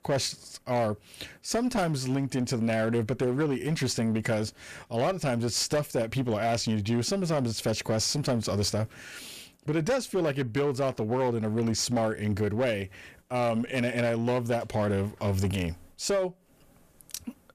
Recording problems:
distortion; slight; 11% of the sound clipped

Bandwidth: 14.5 kHz